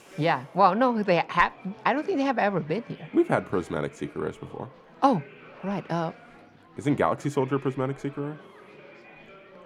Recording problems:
chatter from many people; faint; throughout; 20 dB below the speech

